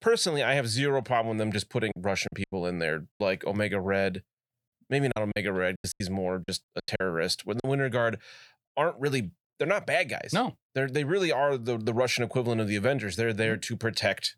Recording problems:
choppy; very; from 2 to 3 s and from 5 to 7.5 s; 14% of the speech affected

